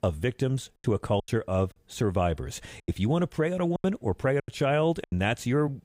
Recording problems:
choppy; very; at 1 s, from 3 to 4 s and at 4.5 s; 12% of the speech affected

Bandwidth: 15.5 kHz